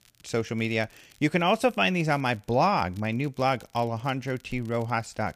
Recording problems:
crackle, like an old record; faint; 30 dB below the speech

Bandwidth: 15 kHz